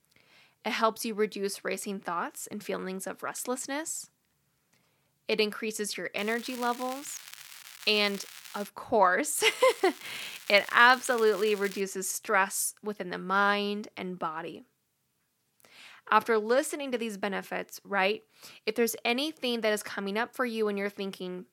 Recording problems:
crackling; noticeable; from 6 to 8.5 s and from 9.5 to 12 s; 15 dB below the speech

